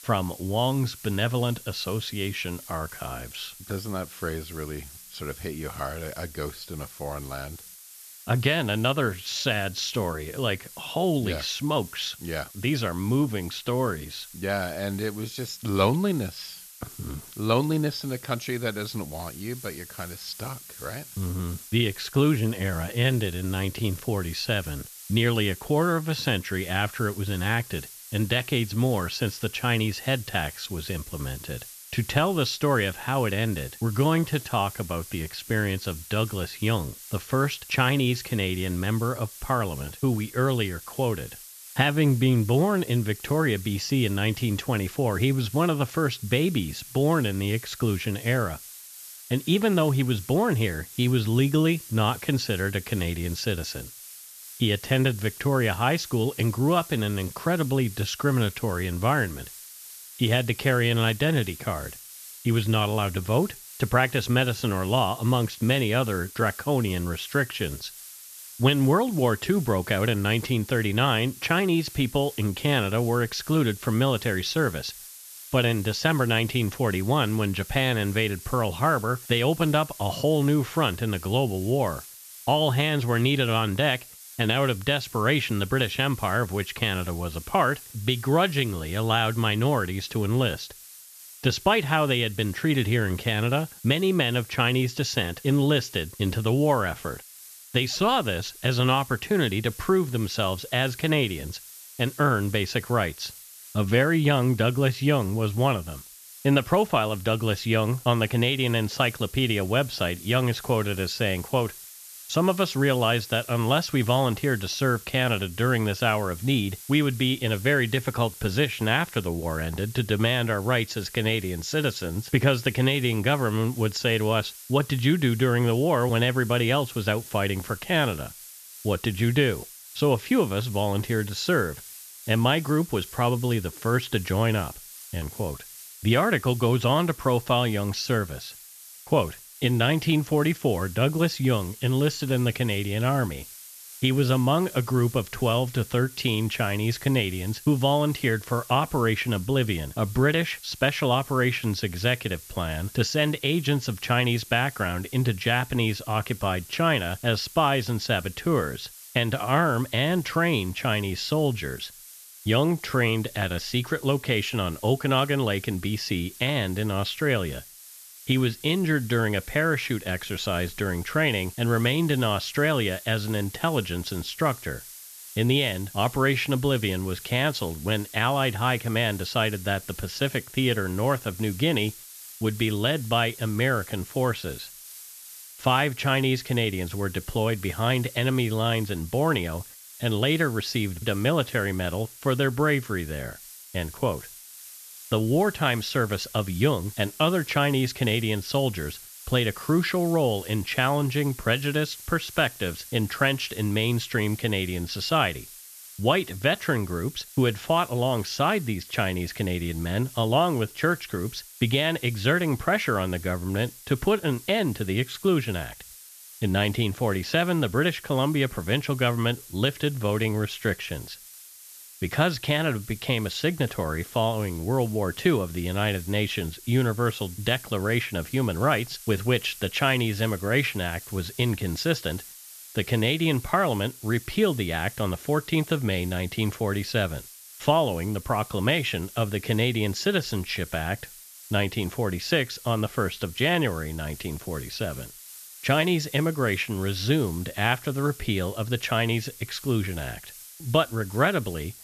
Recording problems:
high frequencies cut off; noticeable; nothing above 8 kHz
hiss; noticeable; throughout; 15 dB below the speech

